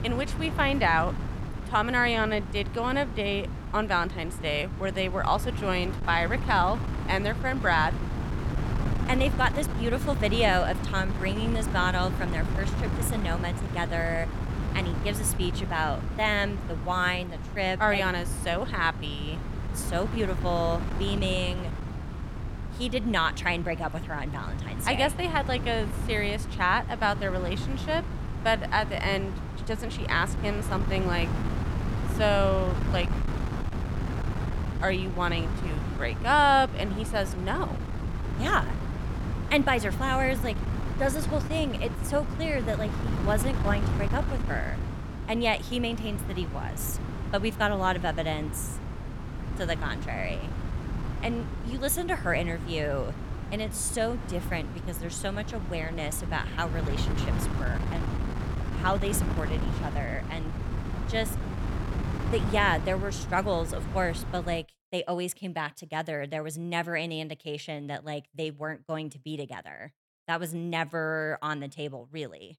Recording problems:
wind noise on the microphone; occasional gusts; until 1:05; 10 dB below the speech

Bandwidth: 17 kHz